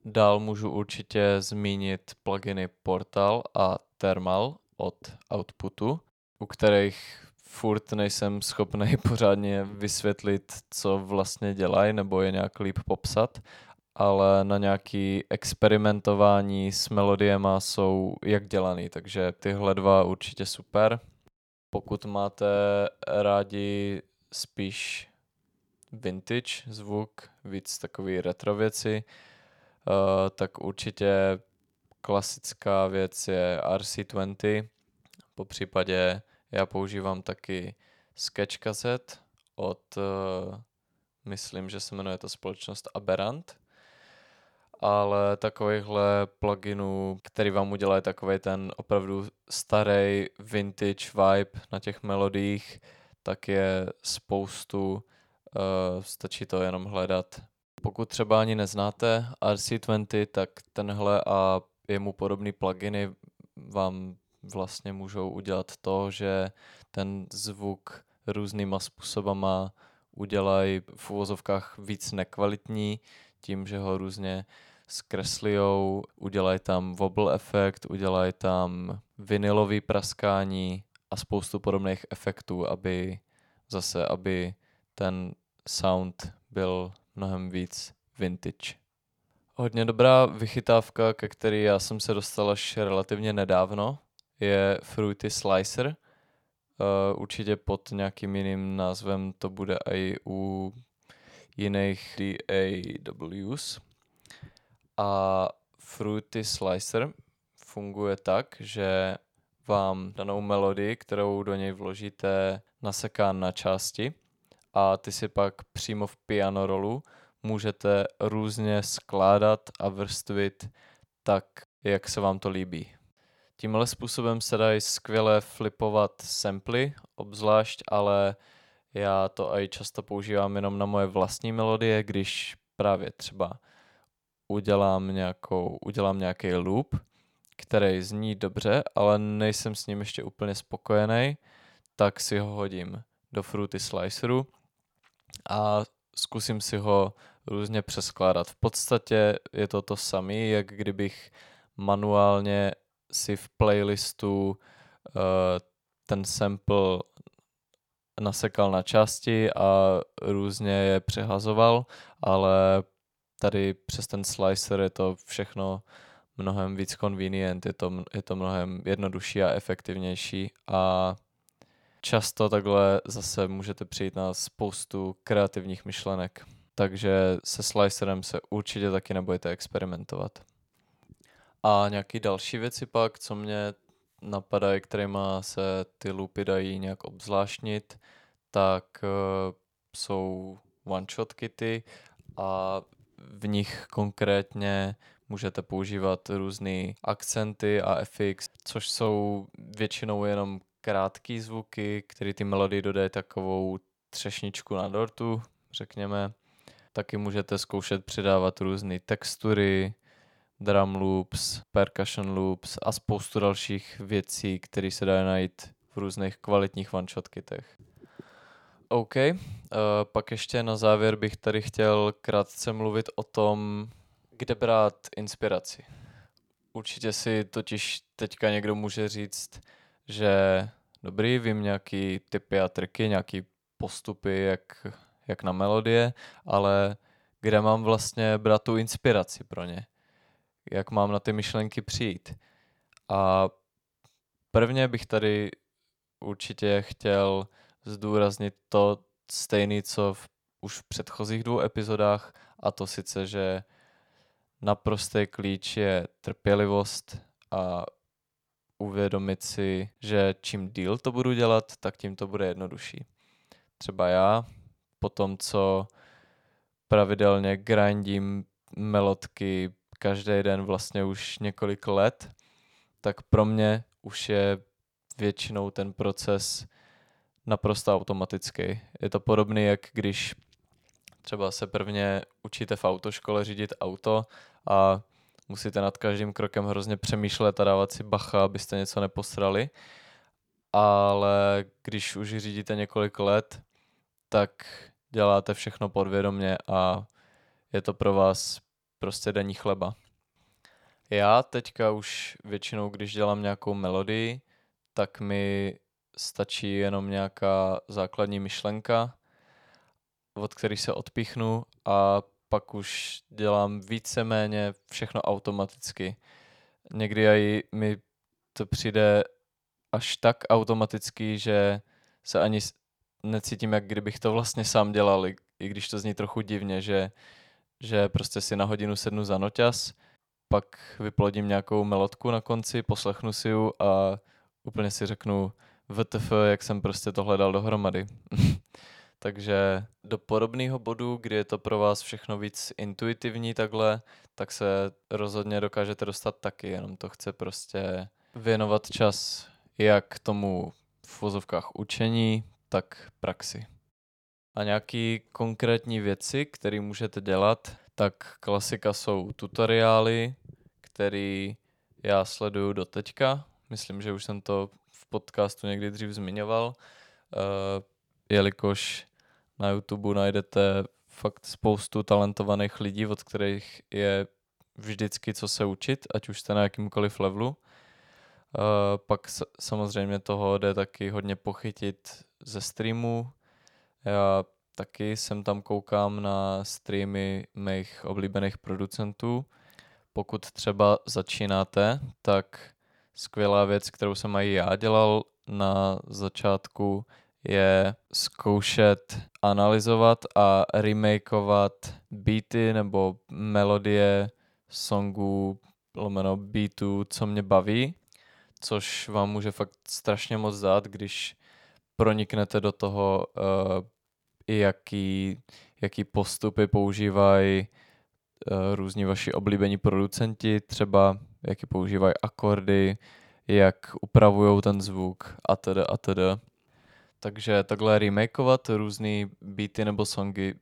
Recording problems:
none

